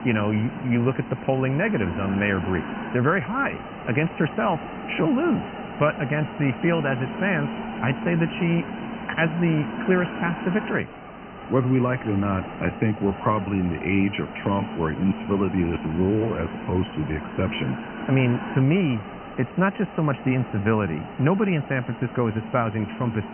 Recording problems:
high frequencies cut off; severe; nothing above 3 kHz
hiss; loud; throughout; 9 dB below the speech

